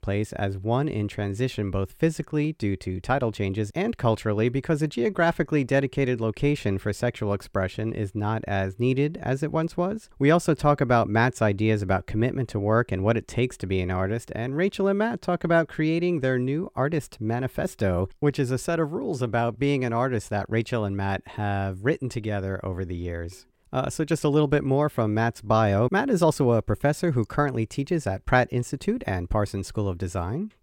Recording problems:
none

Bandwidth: 16.5 kHz